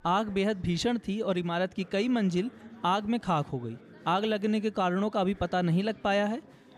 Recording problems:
murmuring crowd; faint; throughout; 25 dB below the speech

